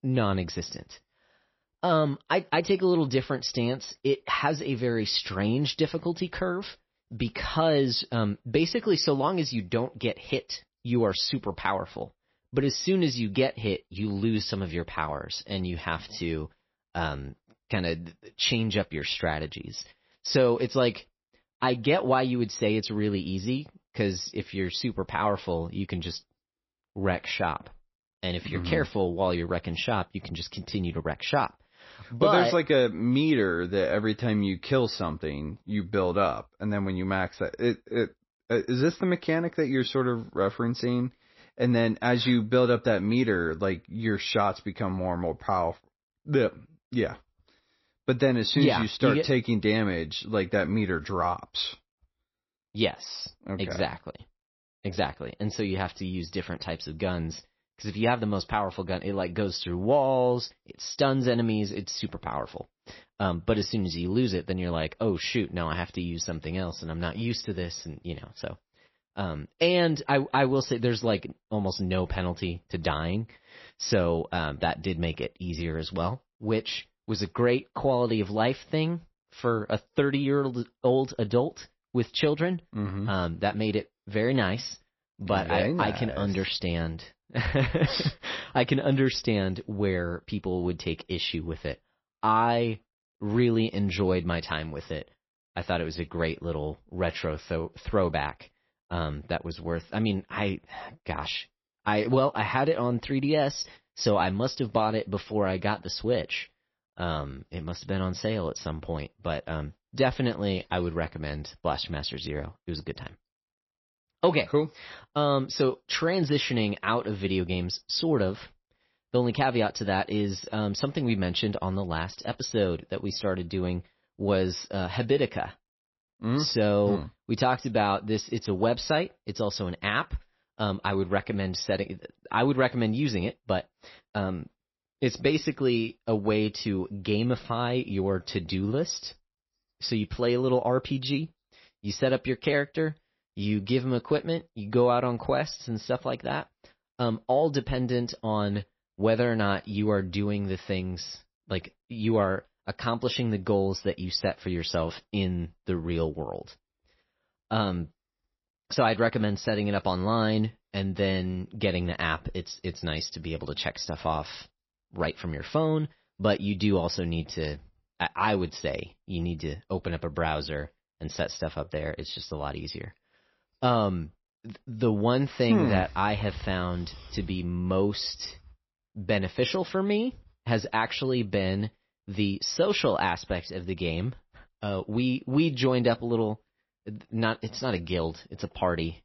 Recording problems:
garbled, watery; slightly; nothing above 5.5 kHz

